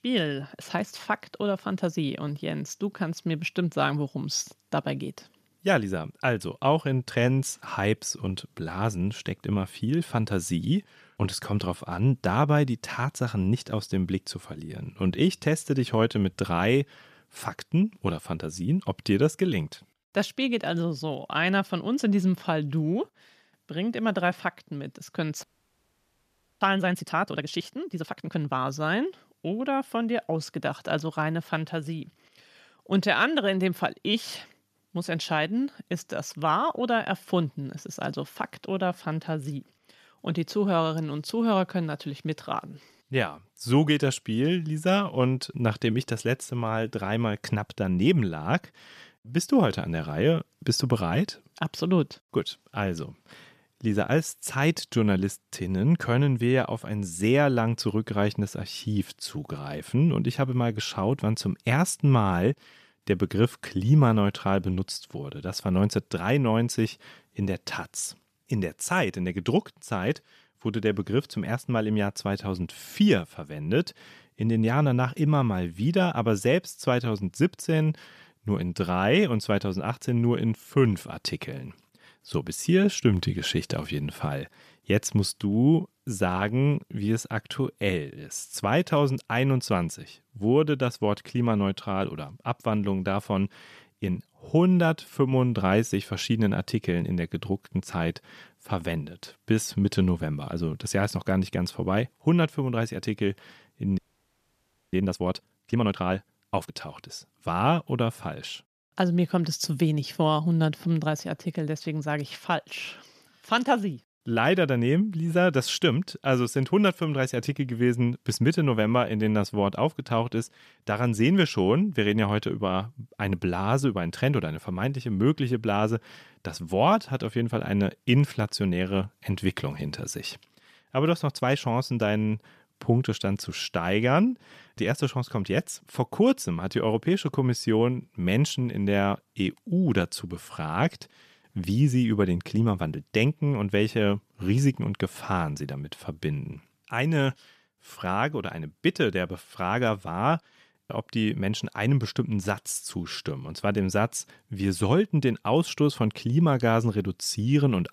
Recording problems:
audio freezing; at 25 s for 1 s and at 1:44 for 1 s

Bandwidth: 14.5 kHz